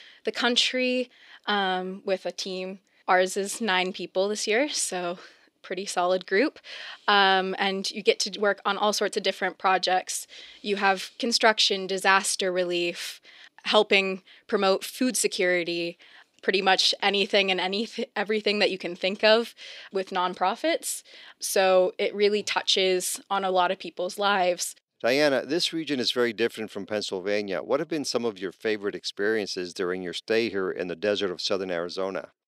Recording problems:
thin; somewhat; fading below 350 Hz

